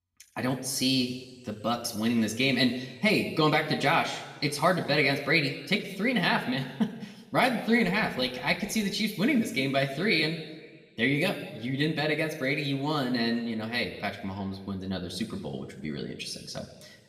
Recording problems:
room echo; slight; dies away in 1.4 s
off-mic speech; somewhat distant

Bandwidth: 15 kHz